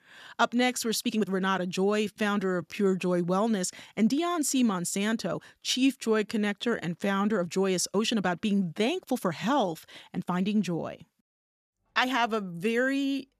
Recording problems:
uneven, jittery; strongly; from 0.5 to 13 s

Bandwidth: 14.5 kHz